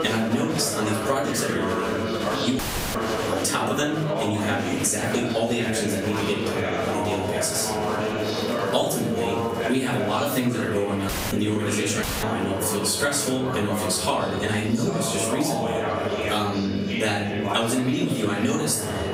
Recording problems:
off-mic speech; far
room echo; noticeable; dies away in 0.5 s
squashed, flat; somewhat
murmuring crowd; loud; throughout; 3 dB below the speech
high-pitched whine; faint; throughout; 3 kHz, 20 dB below the speech
audio cutting out; at 2.5 s, at 11 s and at 12 s

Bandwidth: 15.5 kHz